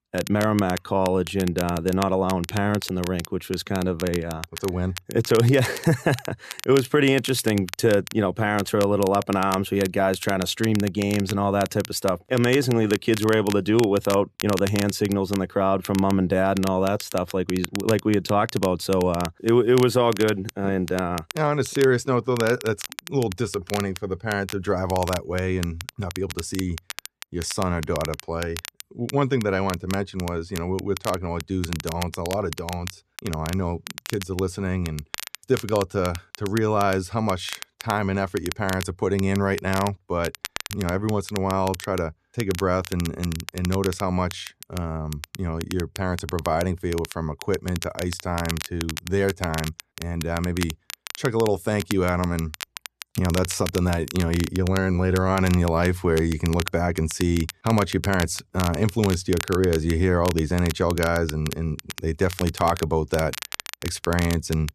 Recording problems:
crackle, like an old record; noticeable; 10 dB below the speech

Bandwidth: 14 kHz